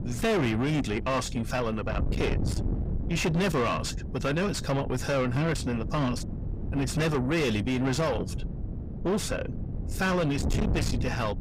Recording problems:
distortion; heavy; 6 dB below the speech
wind noise on the microphone; occasional gusts; 10 dB below the speech

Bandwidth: 15.5 kHz